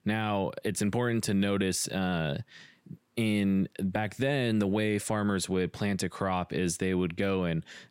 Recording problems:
none

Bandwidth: 16 kHz